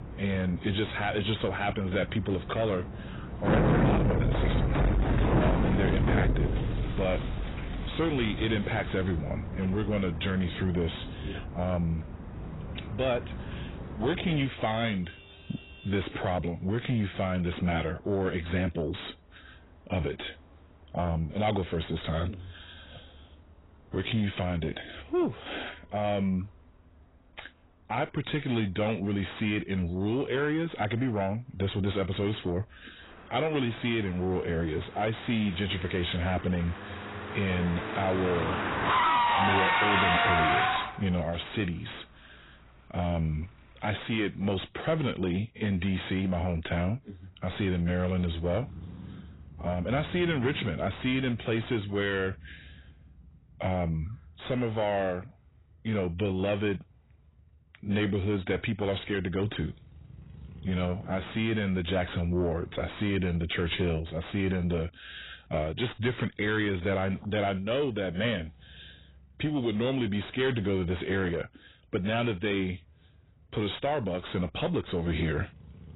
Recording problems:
garbled, watery; badly; nothing above 4 kHz
distortion; slight; 9 dB below the speech
traffic noise; loud; throughout; as loud as the speech

